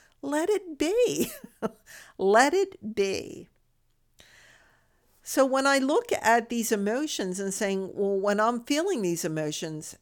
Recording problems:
none

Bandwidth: 18.5 kHz